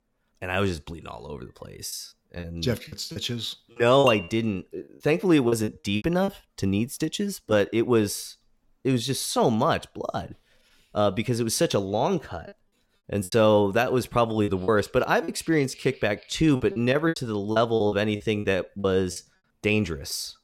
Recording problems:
choppy; very; from 2 to 6.5 s, from 13 to 15 s and from 17 to 19 s; 13% of the speech affected
clattering dishes; noticeable; at 4 s; peak 5 dB below the speech

